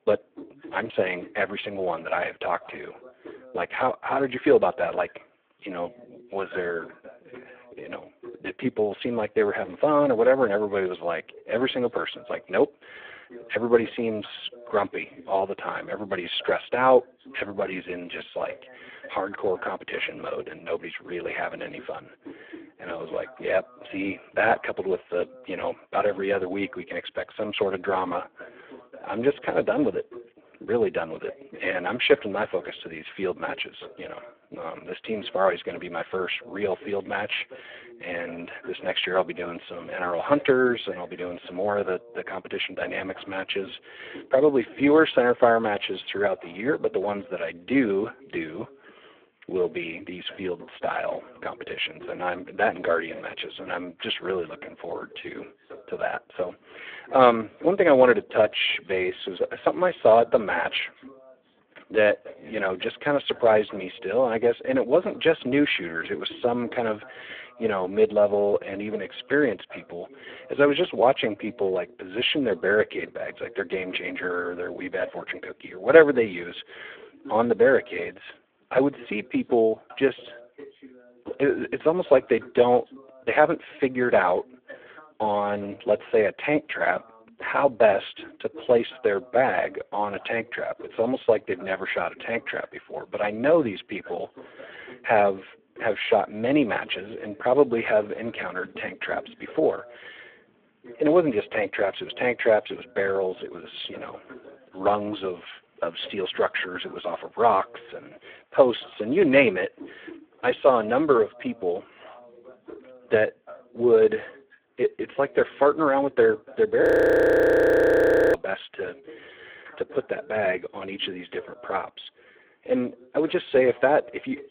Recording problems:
phone-call audio; poor line
voice in the background; faint; throughout; 25 dB below the speech
audio freezing; at 1:57 for 1.5 s

